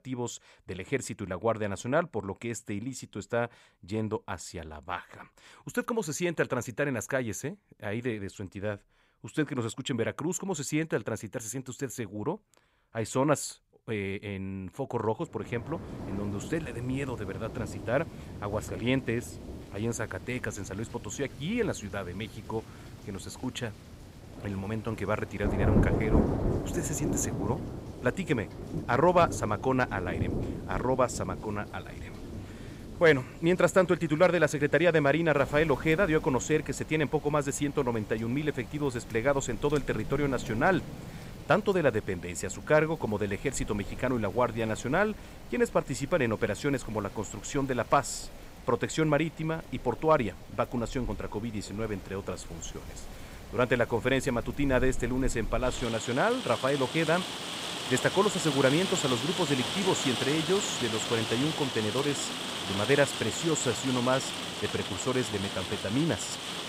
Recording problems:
rain or running water; loud; from 16 s on; 6 dB below the speech

